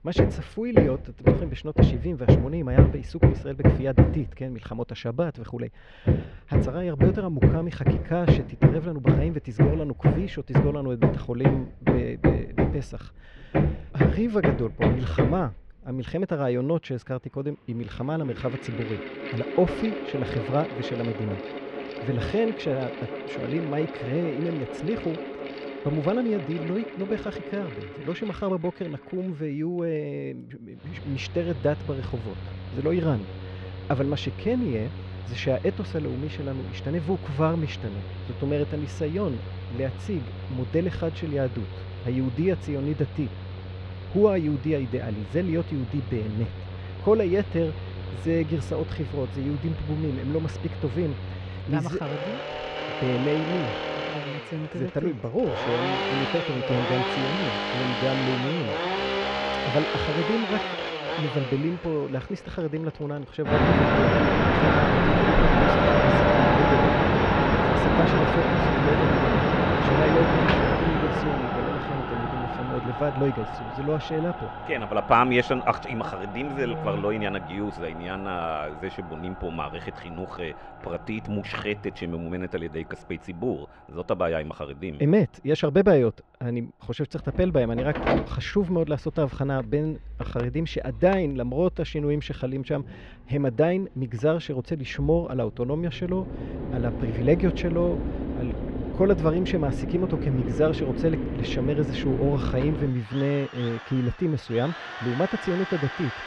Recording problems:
muffled; slightly; fading above 2.5 kHz
machinery noise; very loud; throughout; 1 dB above the speech

